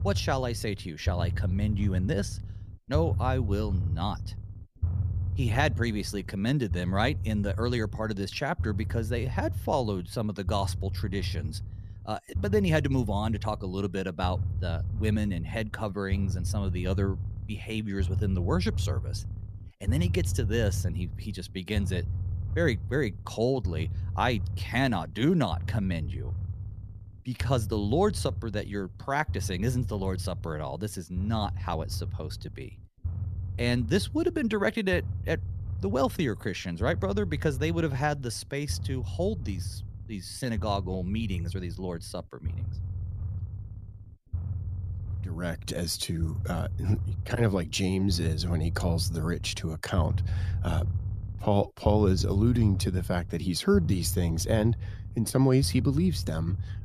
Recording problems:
low rumble; noticeable; throughout; 15 dB below the speech

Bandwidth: 14.5 kHz